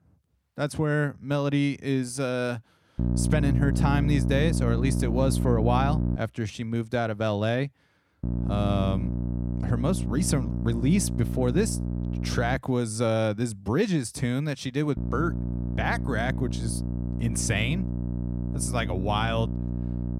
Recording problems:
electrical hum; loud; from 3 to 6 s, from 8 to 13 s and from 15 s on; 60 Hz, 9 dB below the speech

